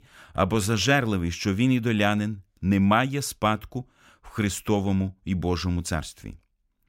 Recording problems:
none

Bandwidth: 16 kHz